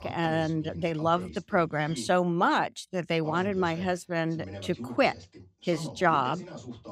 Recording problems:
voice in the background; noticeable; throughout; 15 dB below the speech

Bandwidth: 15.5 kHz